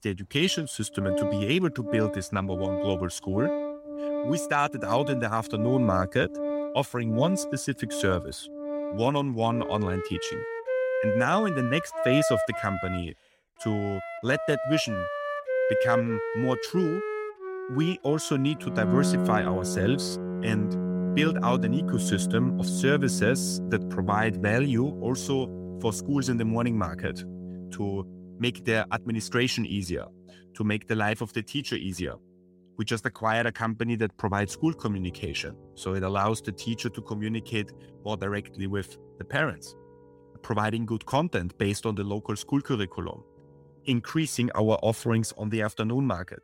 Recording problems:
background music; loud; throughout; 3 dB below the speech

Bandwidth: 16.5 kHz